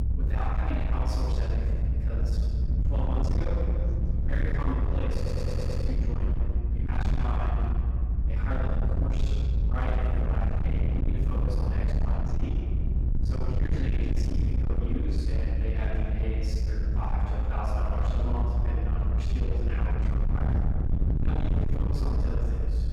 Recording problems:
distortion; heavy; 36% of the sound clipped
room echo; strong; dies away in 1.7 s
off-mic speech; far
low rumble; loud; throughout; 4 dB below the speech
voice in the background; faint; throughout; 25 dB below the speech
audio stuttering; at 5 s

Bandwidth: 17.5 kHz